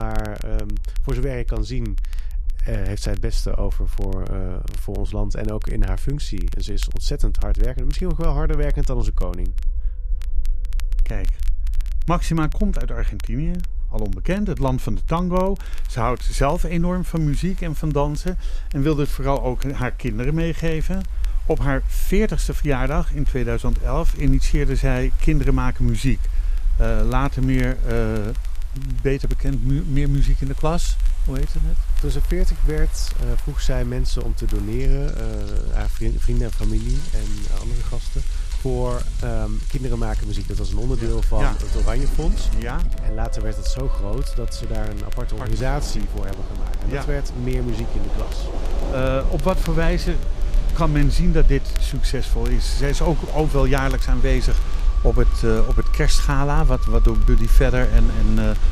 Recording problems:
rain or running water; noticeable; throughout; 15 dB below the speech
background music; faint; throughout; 20 dB below the speech
low rumble; faint; throughout; 25 dB below the speech
crackle, like an old record; faint; 20 dB below the speech
abrupt cut into speech; at the start

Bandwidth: 14.5 kHz